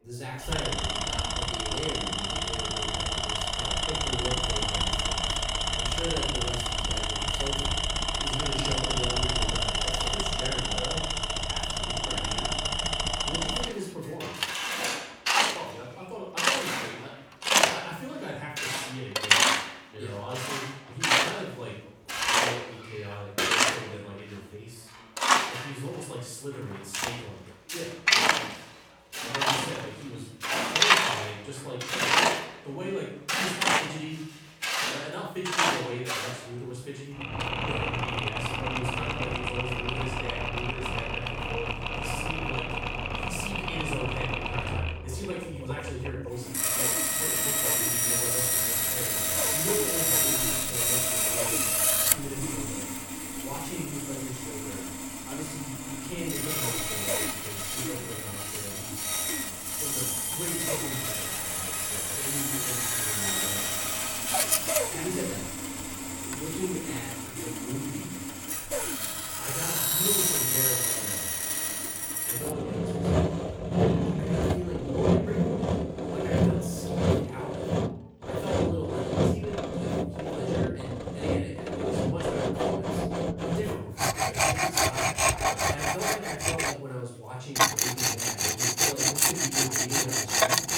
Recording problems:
off-mic speech; far
room echo; noticeable; dies away in 0.6 s
machinery noise; very loud; throughout; 10 dB above the speech
chatter from many people; faint; throughout; 25 dB below the speech

